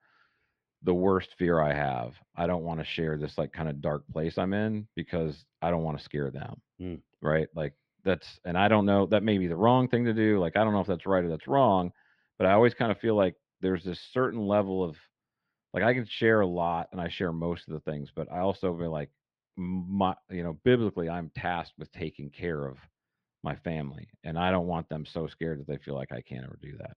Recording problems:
muffled; slightly; fading above 3 kHz

